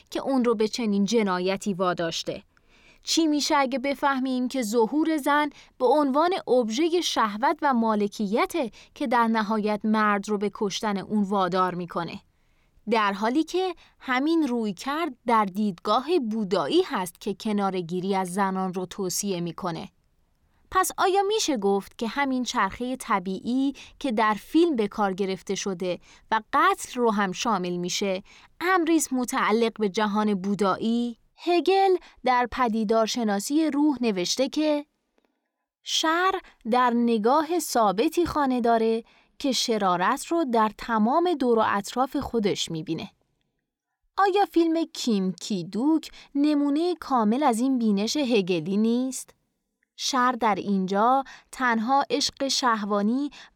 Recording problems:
none

